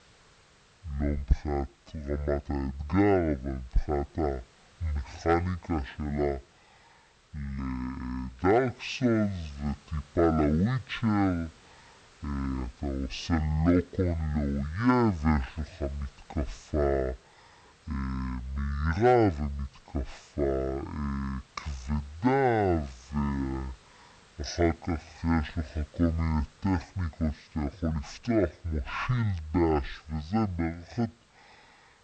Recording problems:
wrong speed and pitch; too slow and too low; 0.5 times normal speed
hiss; faint; throughout; 30 dB below the speech

